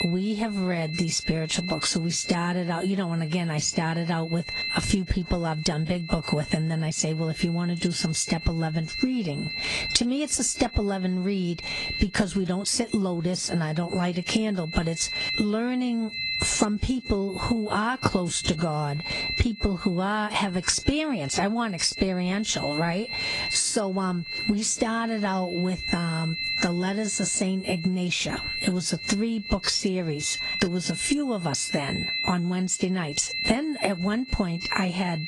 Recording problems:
squashed, flat; heavily
garbled, watery; slightly
high-pitched whine; loud; throughout; 4 kHz, 7 dB below the speech

